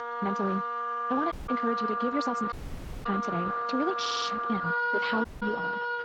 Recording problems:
wrong speed, natural pitch; too fast; 1.5 times normal speed
garbled, watery; slightly
background music; very loud; throughout; 2 dB above the speech
audio cutting out; at 1.5 s, at 2.5 s for 0.5 s and at 5.5 s
audio stuttering; at 4 s

